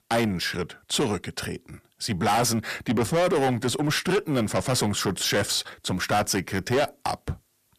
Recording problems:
distortion; heavy; 6 dB below the speech

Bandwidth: 14.5 kHz